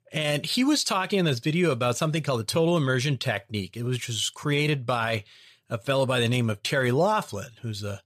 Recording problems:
none

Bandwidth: 14.5 kHz